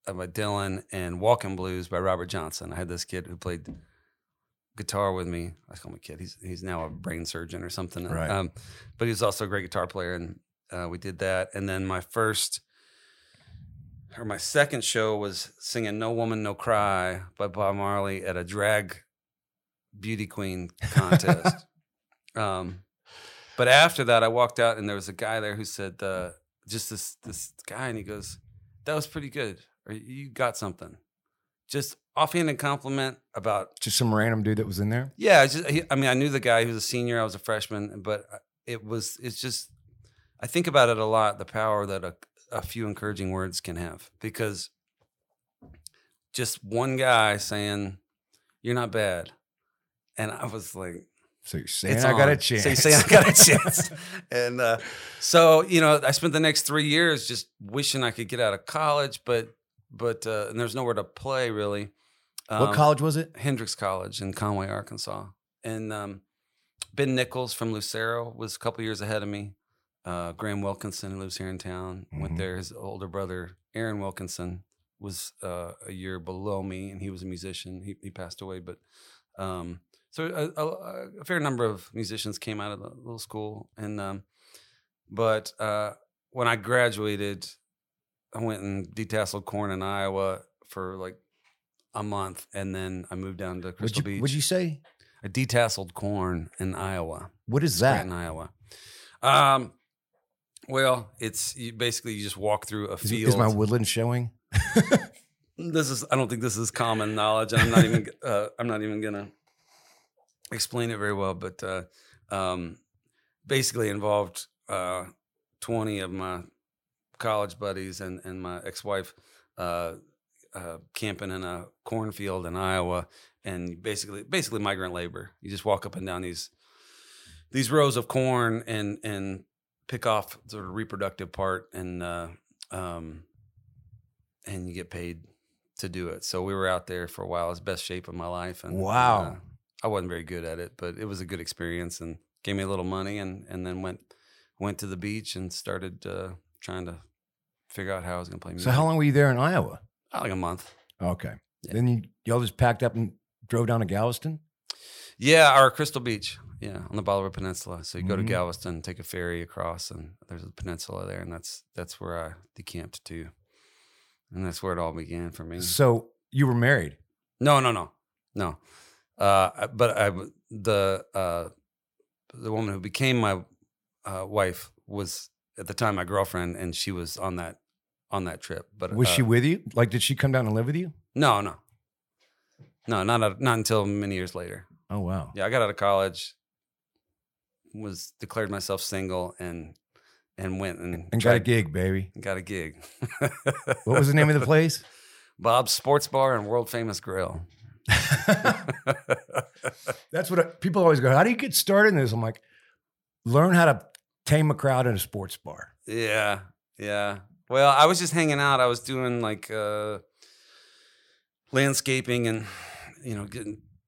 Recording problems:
none

